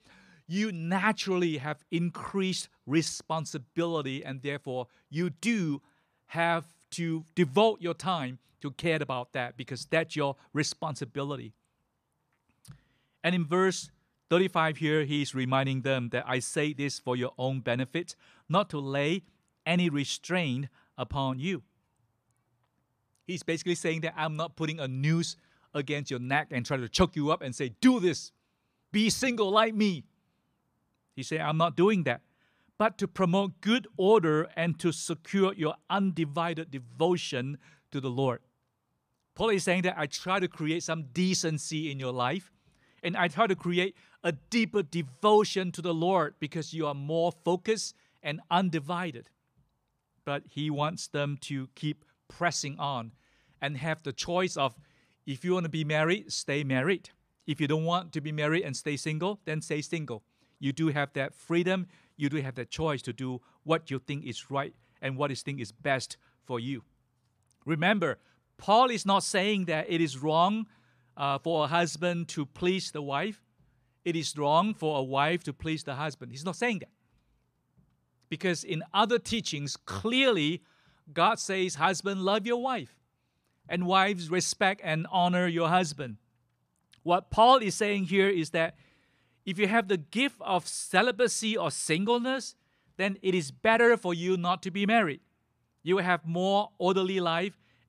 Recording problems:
none

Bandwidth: 14.5 kHz